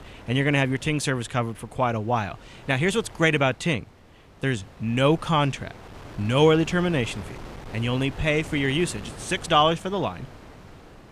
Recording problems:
wind noise on the microphone; occasional gusts; 20 dB below the speech

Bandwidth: 15 kHz